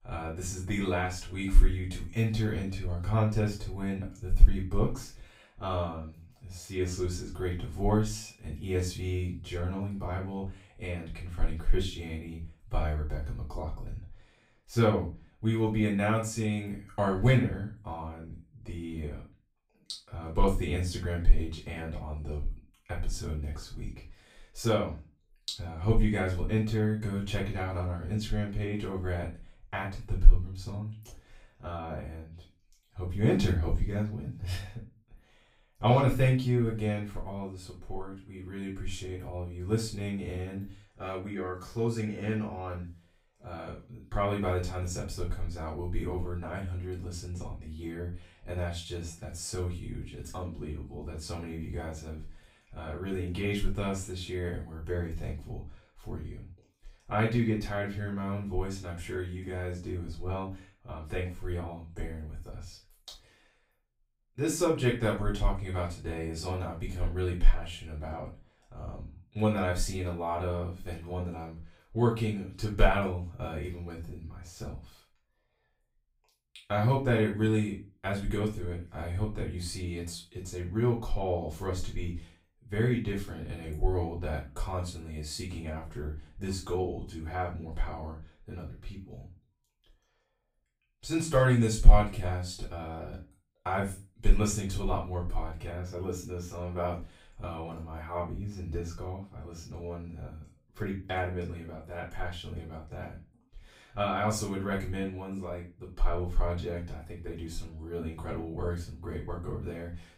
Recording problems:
off-mic speech; far
room echo; slight; dies away in 0.3 s

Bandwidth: 15.5 kHz